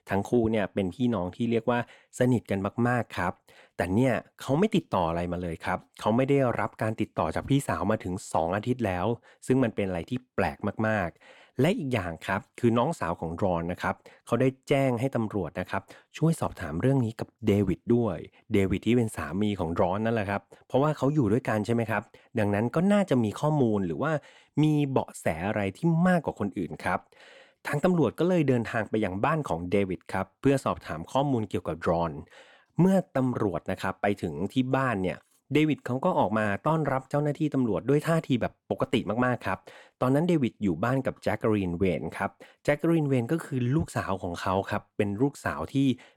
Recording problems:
none

